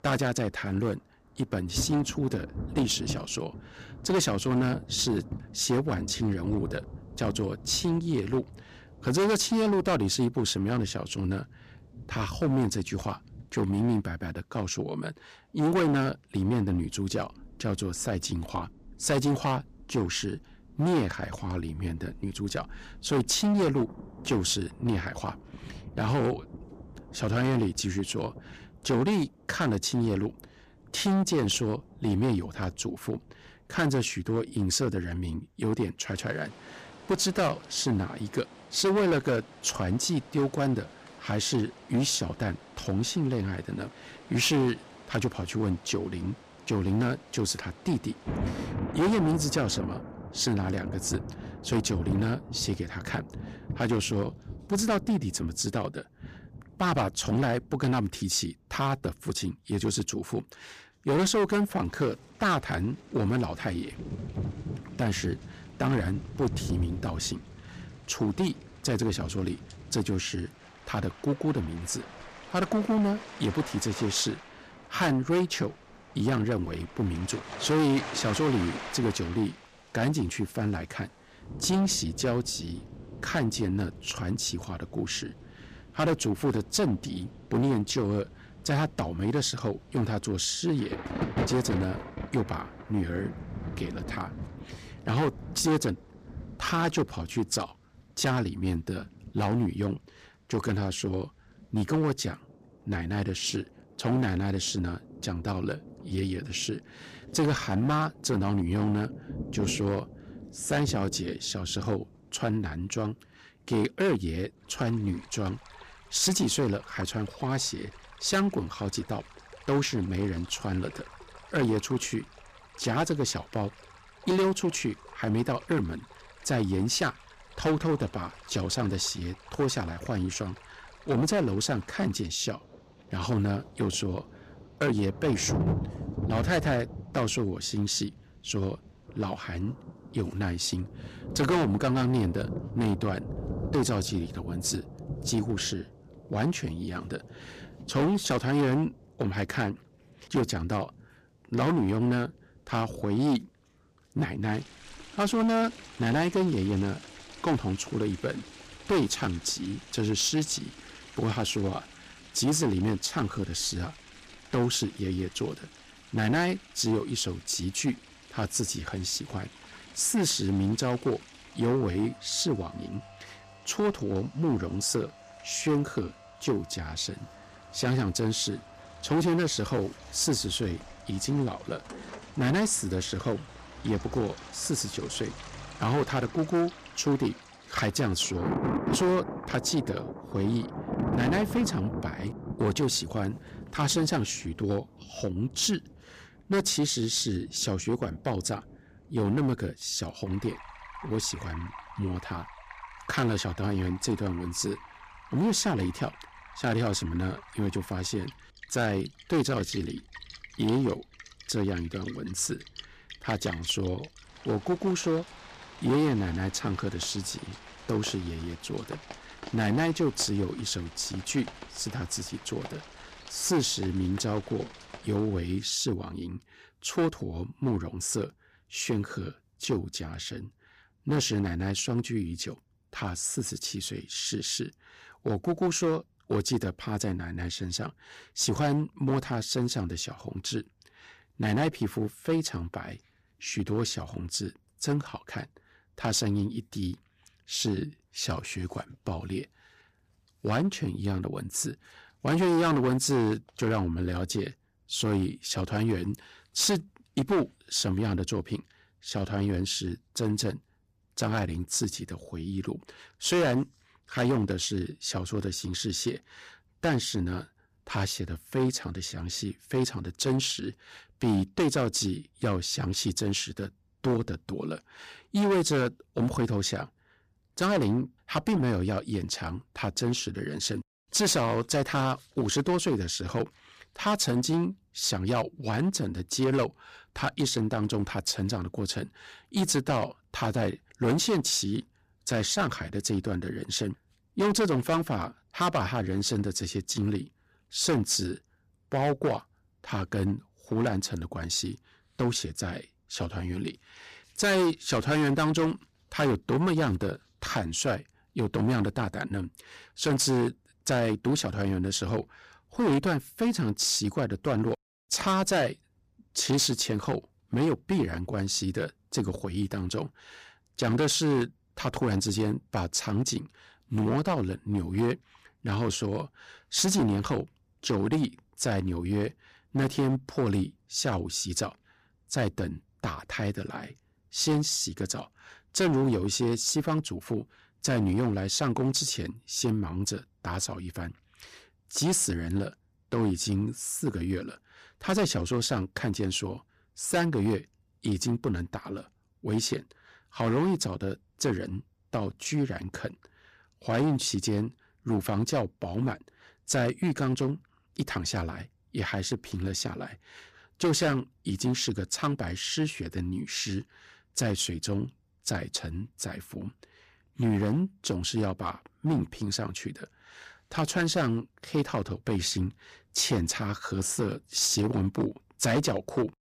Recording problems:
distortion; heavy; 7% of the sound clipped
rain or running water; noticeable; until 3:45; 15 dB below the speech

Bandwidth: 15 kHz